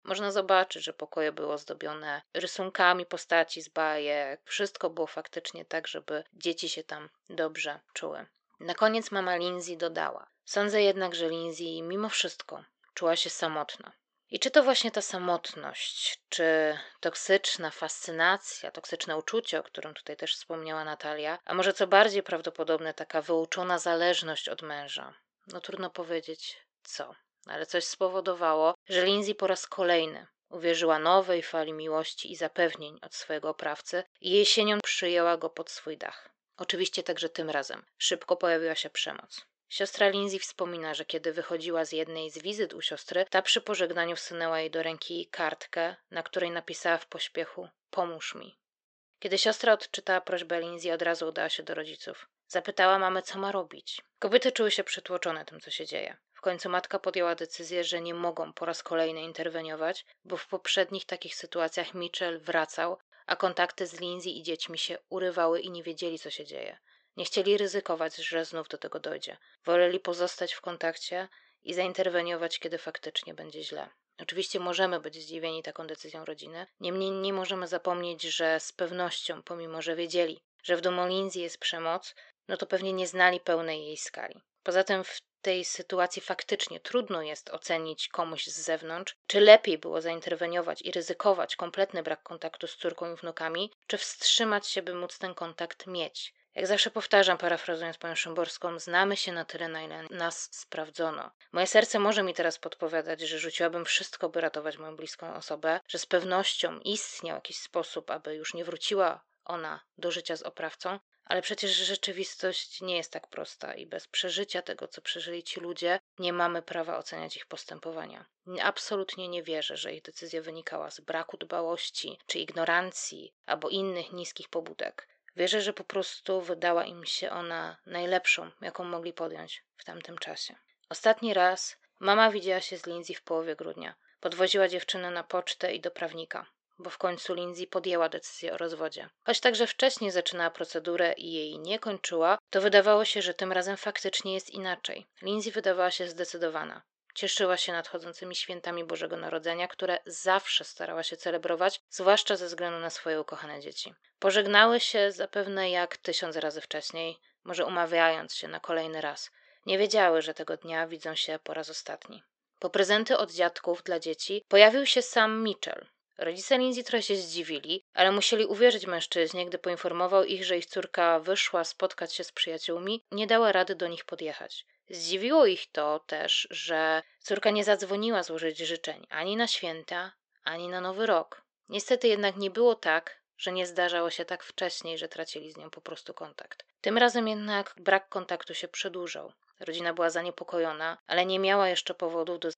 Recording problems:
thin; somewhat; fading below 500 Hz
high frequencies cut off; noticeable; nothing above 8 kHz

